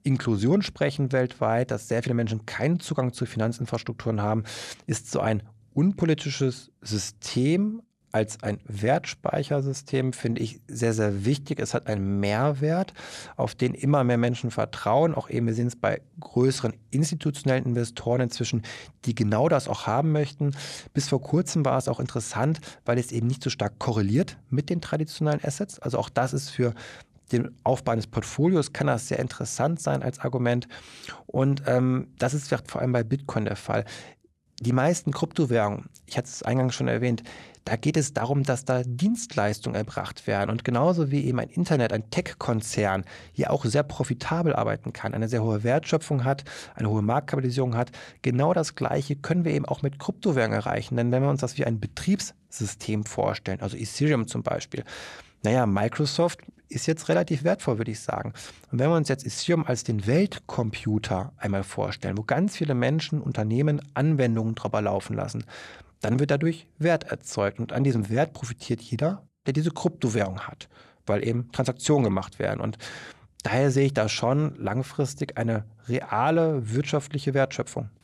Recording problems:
none

